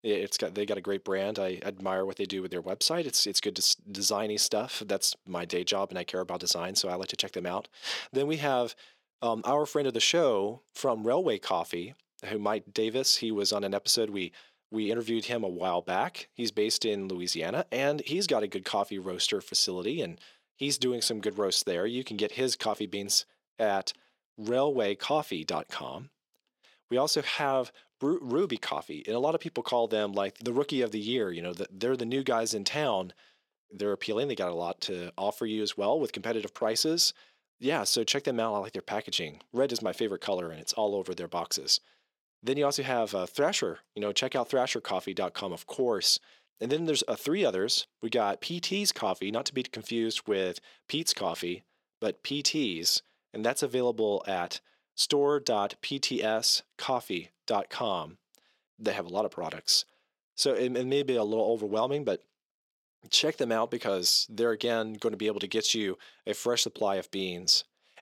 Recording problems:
thin; somewhat; fading below 350 Hz

